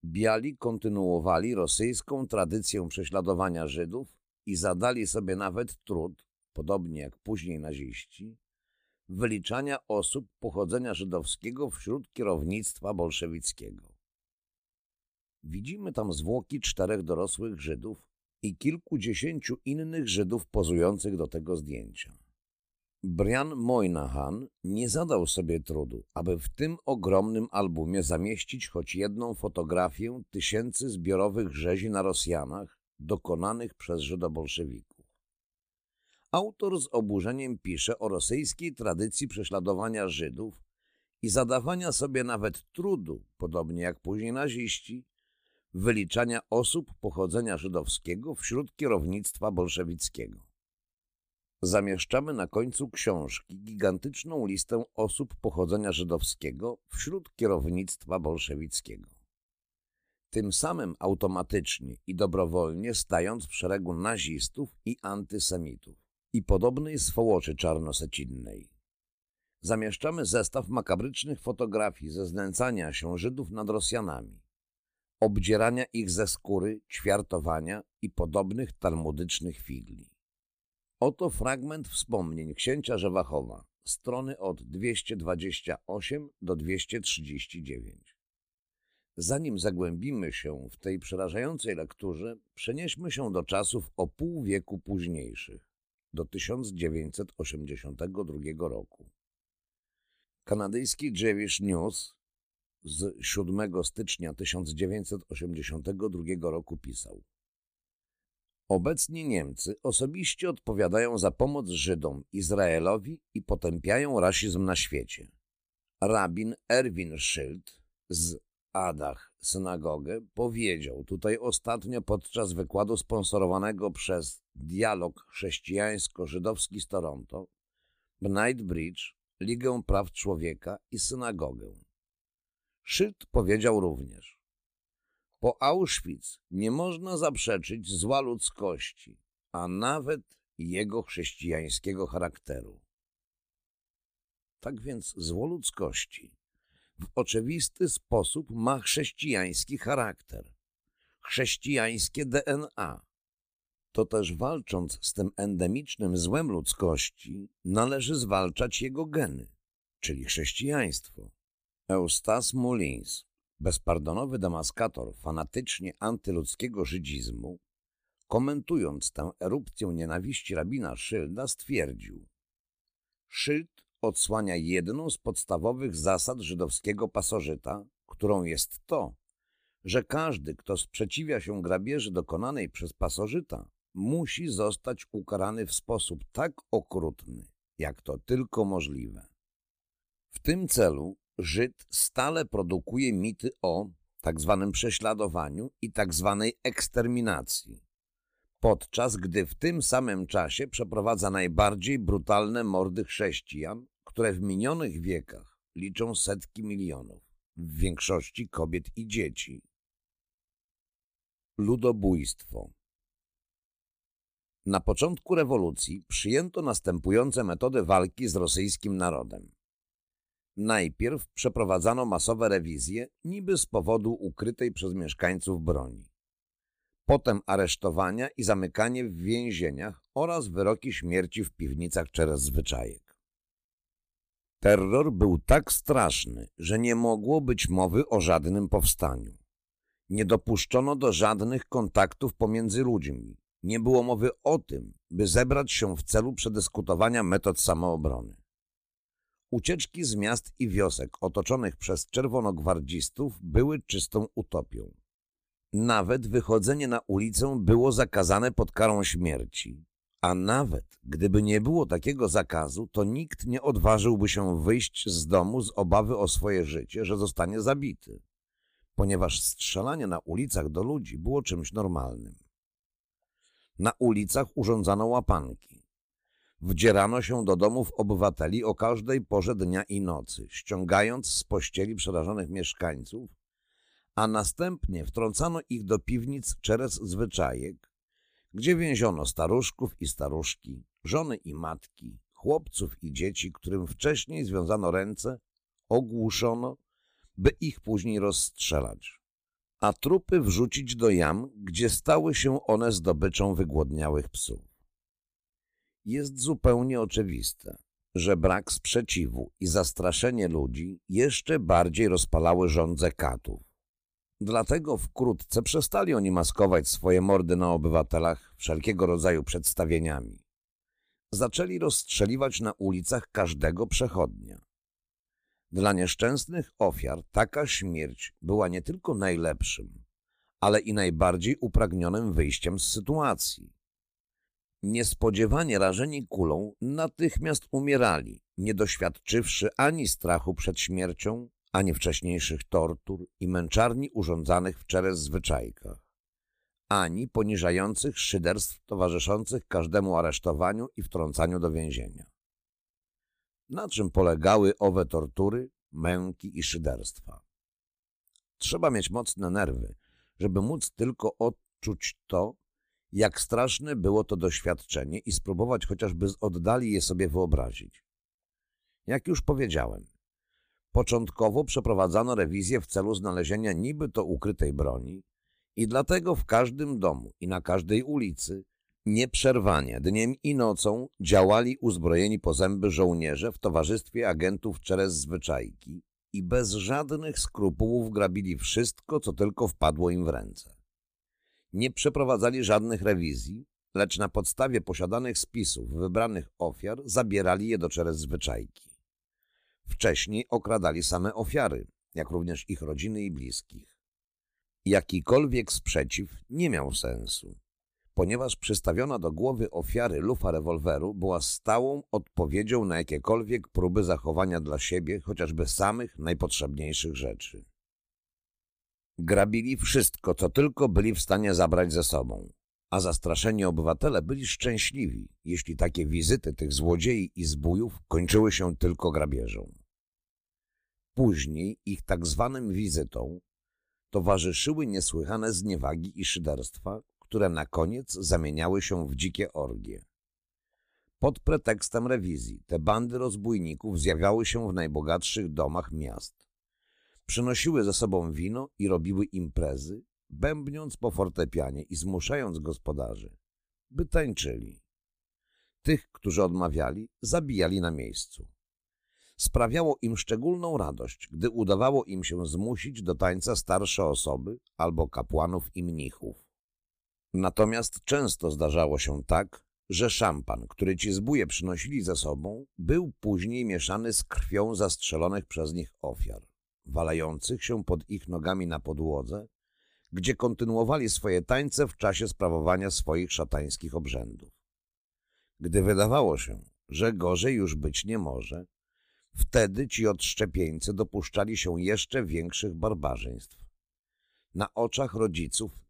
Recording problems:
none

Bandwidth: 15 kHz